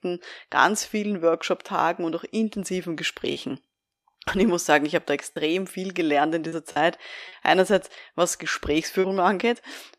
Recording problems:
choppy; occasionally; 3% of the speech affected

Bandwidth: 14.5 kHz